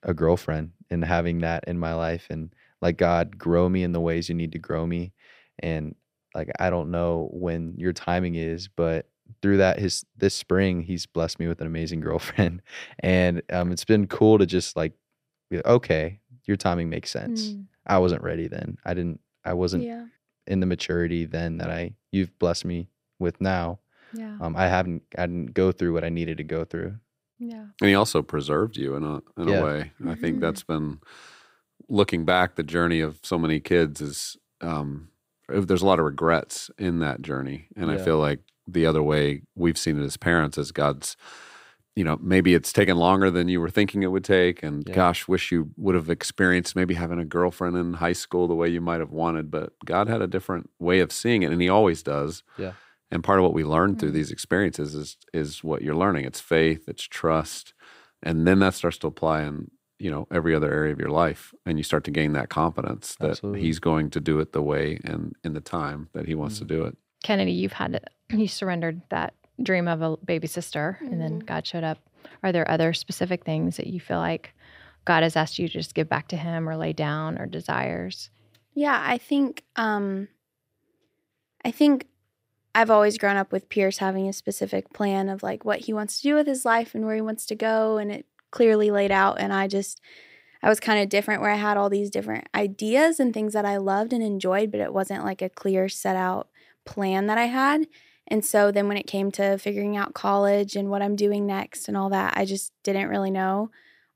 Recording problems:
none

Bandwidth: 15.5 kHz